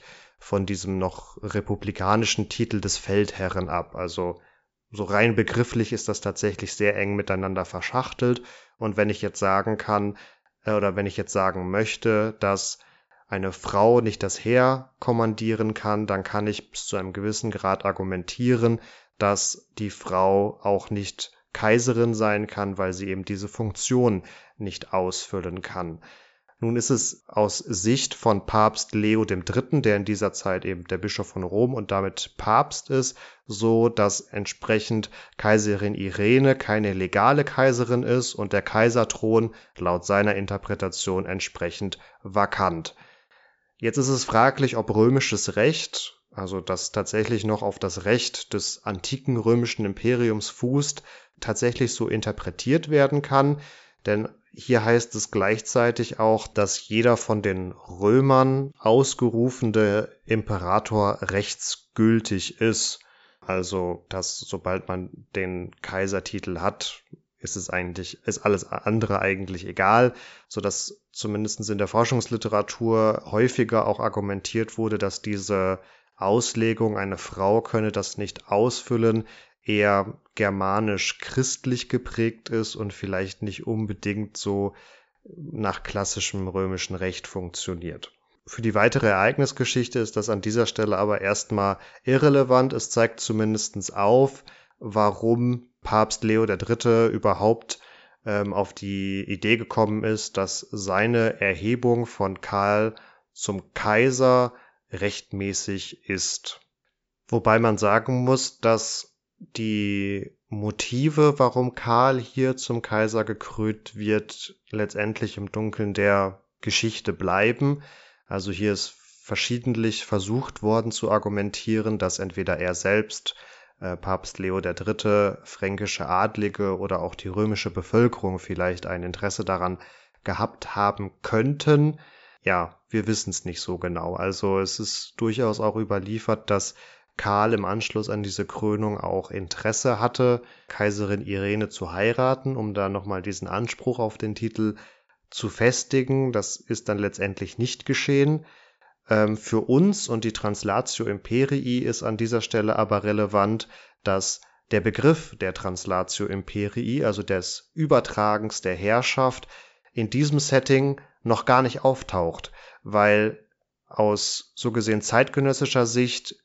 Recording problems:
high frequencies cut off; noticeable; nothing above 8 kHz

